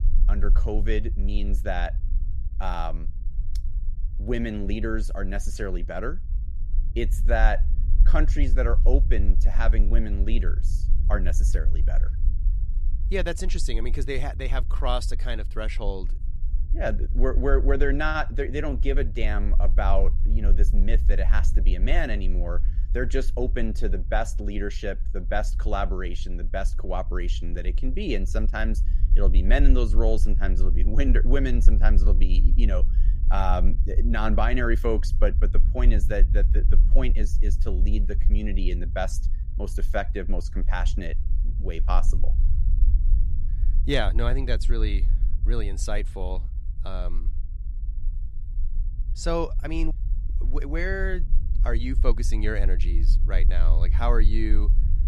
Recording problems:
low rumble; noticeable; throughout; 15 dB below the speech

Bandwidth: 15 kHz